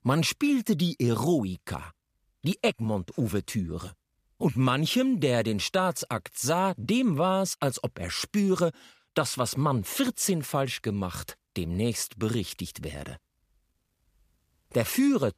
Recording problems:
none

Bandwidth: 15 kHz